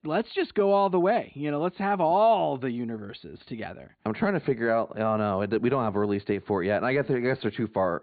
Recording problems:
high frequencies cut off; severe; nothing above 4.5 kHz

